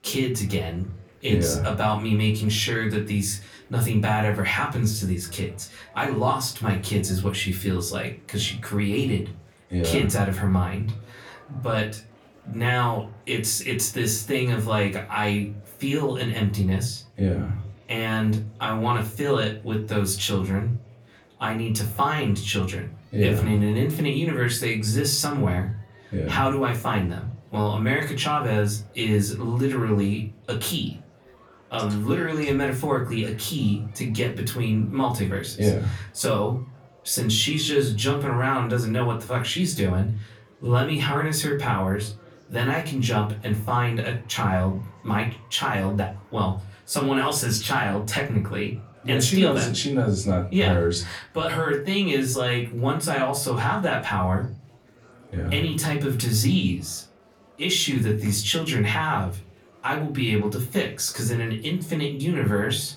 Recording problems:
off-mic speech; far
room echo; very slight; dies away in 0.3 s
murmuring crowd; faint; throughout; 30 dB below the speech

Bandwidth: 17.5 kHz